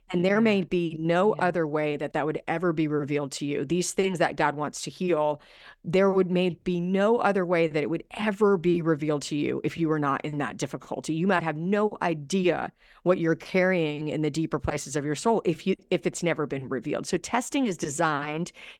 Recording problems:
none

